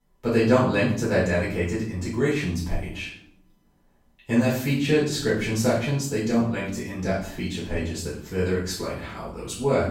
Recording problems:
off-mic speech; far
room echo; noticeable; dies away in 0.5 s

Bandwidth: 16.5 kHz